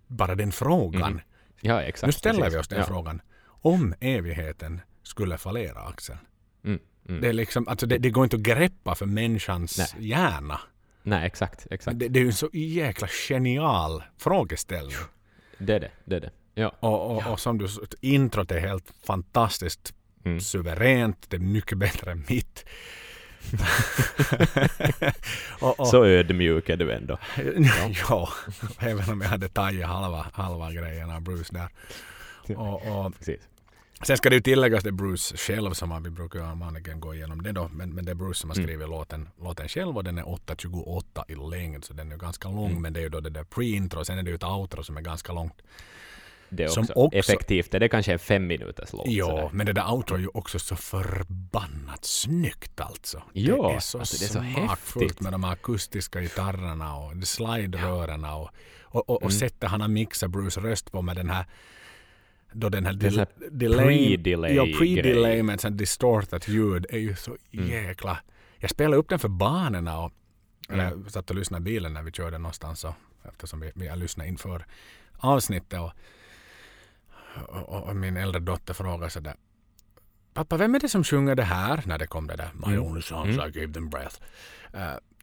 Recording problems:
none

